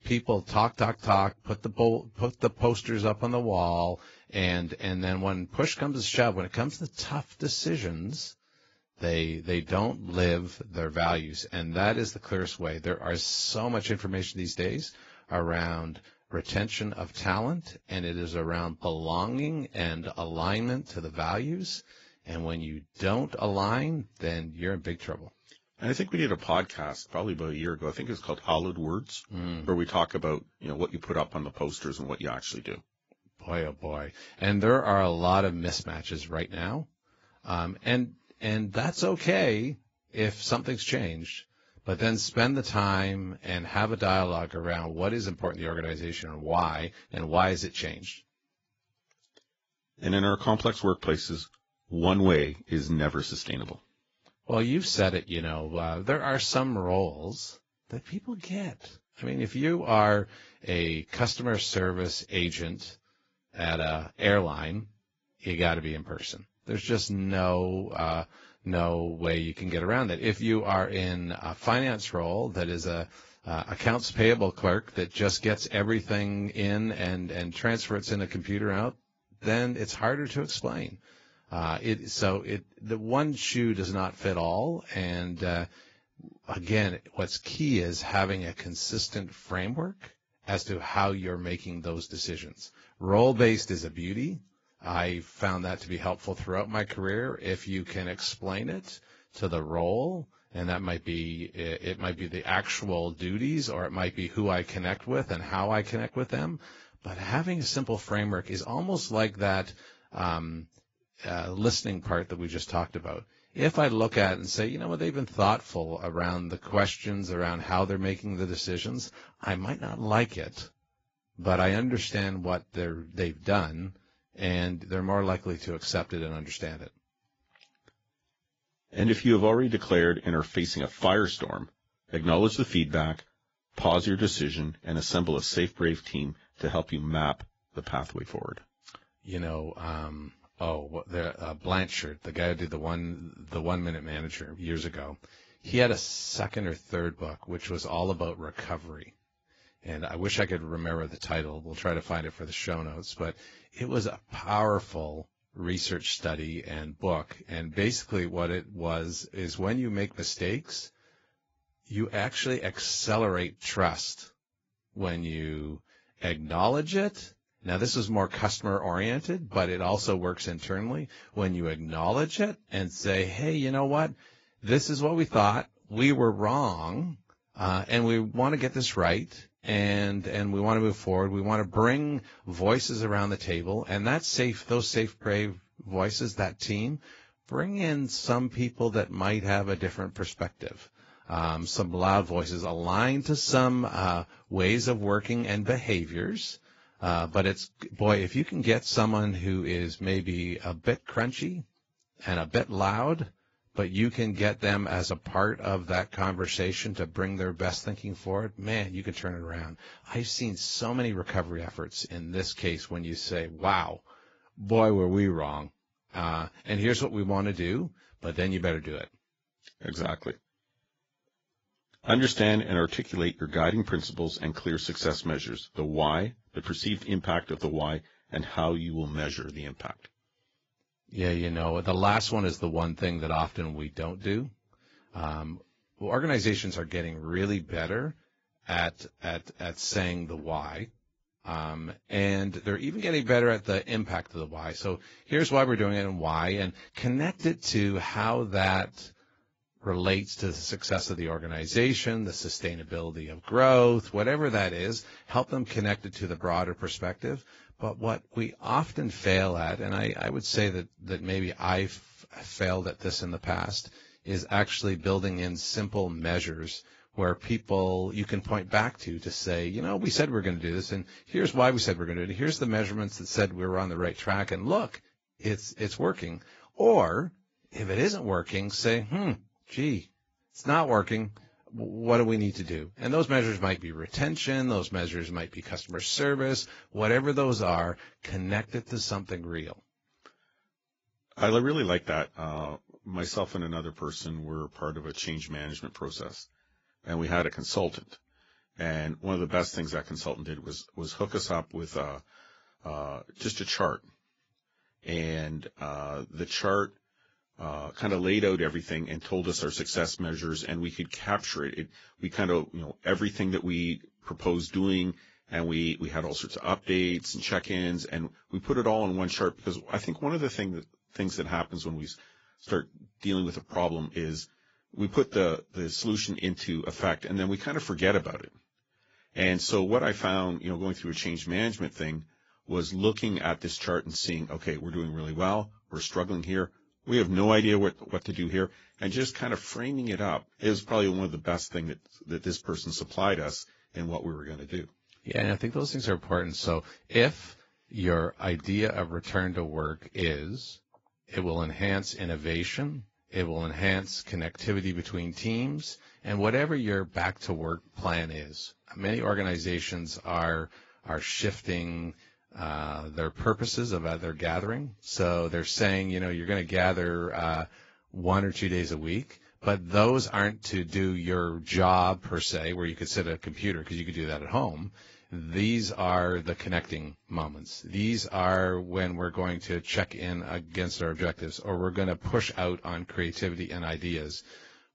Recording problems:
garbled, watery; badly; nothing above 7.5 kHz

